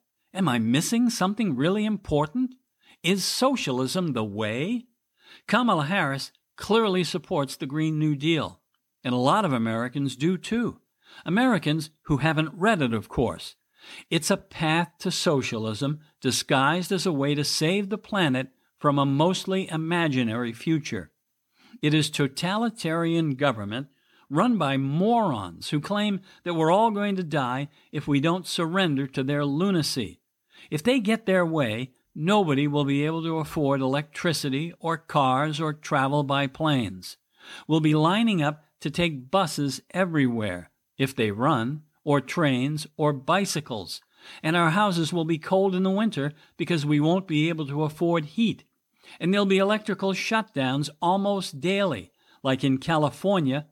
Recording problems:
none

